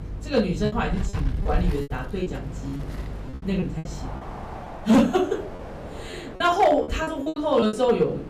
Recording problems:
off-mic speech; far
room echo; slight; dies away in 0.3 s
distortion; slight; 1.5% of the sound clipped
wind in the background; noticeable; throughout; 10 dB below the speech
electrical hum; faint; until 4 s; 50 Hz, 25 dB below the speech
choppy; very; 12% of the speech affected

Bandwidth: 15 kHz